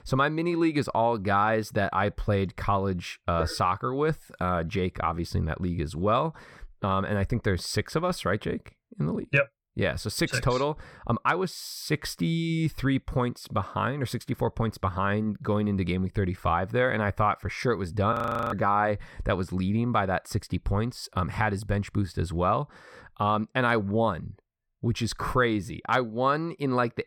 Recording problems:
audio freezing; at 18 s

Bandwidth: 17 kHz